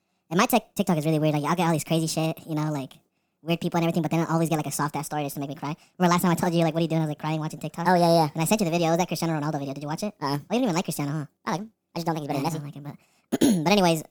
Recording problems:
wrong speed and pitch; too fast and too high; 1.5 times normal speed

